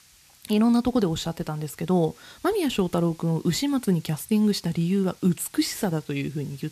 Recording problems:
hiss; faint; throughout; 25 dB below the speech

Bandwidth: 14.5 kHz